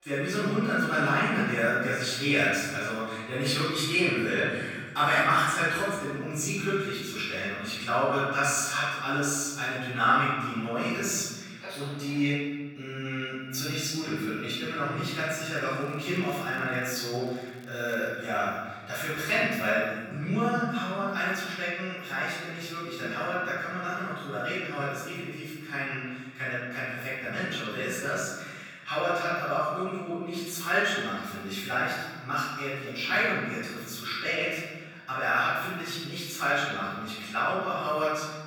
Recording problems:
room echo; strong; dies away in 1.6 s
off-mic speech; far
thin; somewhat; fading below 550 Hz
crackling; faint; from 16 to 18 s; 30 dB below the speech

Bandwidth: 18 kHz